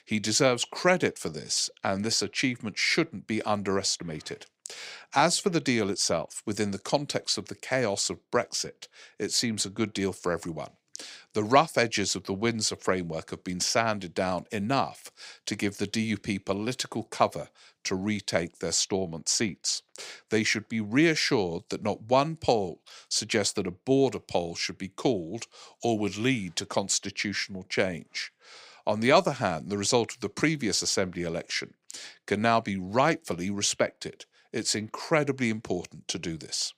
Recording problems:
none

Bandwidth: 15.5 kHz